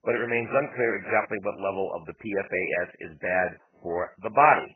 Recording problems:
garbled, watery; badly; nothing above 2.5 kHz

